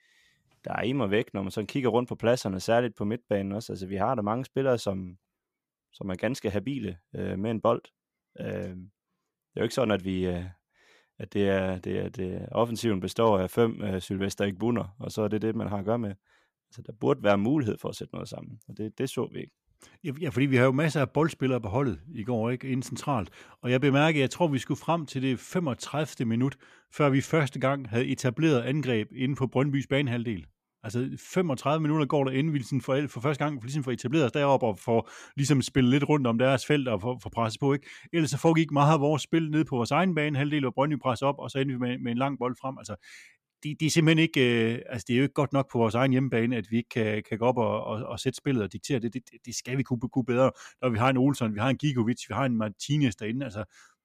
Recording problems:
none

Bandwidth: 14.5 kHz